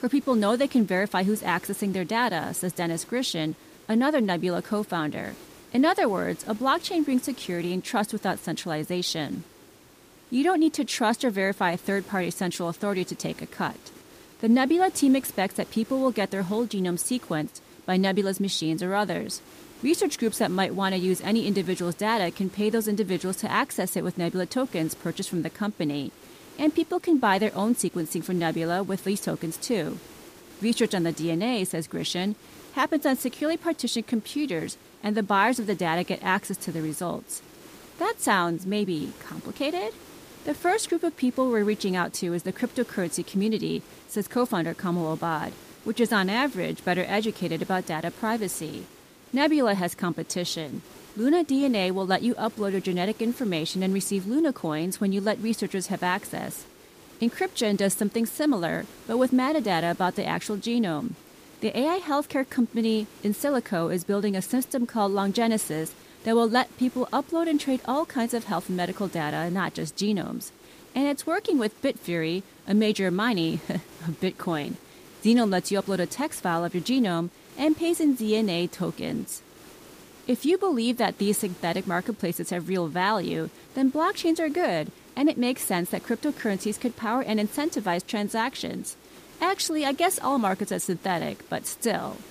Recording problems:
hiss; faint; throughout; 20 dB below the speech

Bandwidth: 15 kHz